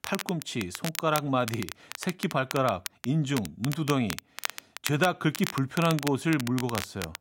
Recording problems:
crackle, like an old record; loud; 9 dB below the speech

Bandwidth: 16 kHz